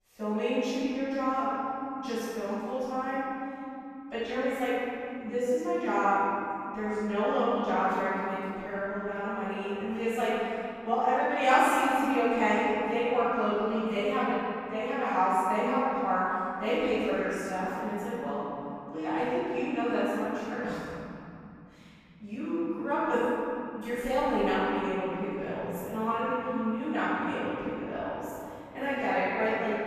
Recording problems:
room echo; strong; dies away in 3 s
off-mic speech; far

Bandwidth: 14.5 kHz